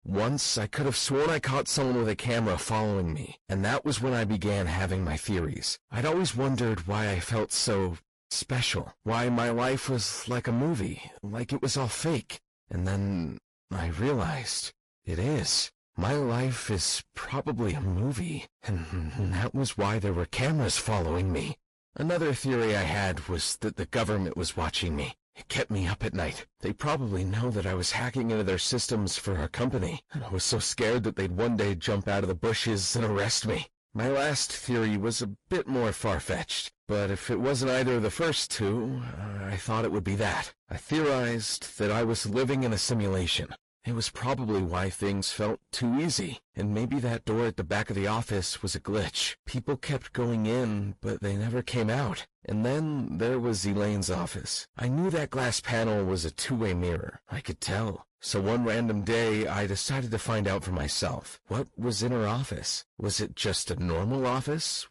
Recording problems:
distortion; heavy; 7 dB below the speech
garbled, watery; slightly; nothing above 11 kHz

